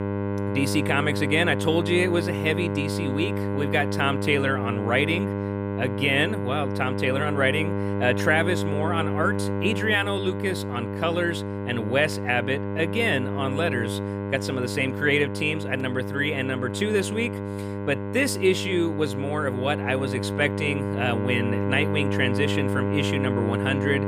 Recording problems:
electrical hum; loud; throughout; 50 Hz, 6 dB below the speech

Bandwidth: 15 kHz